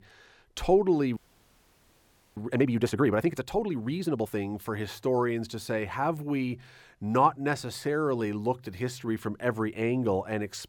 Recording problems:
audio freezing; at 1 s for 1 s

